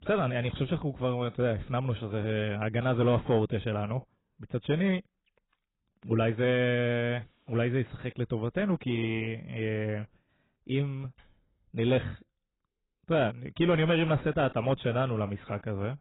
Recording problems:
garbled, watery; badly; nothing above 3.5 kHz
distortion; slight; 10 dB below the speech

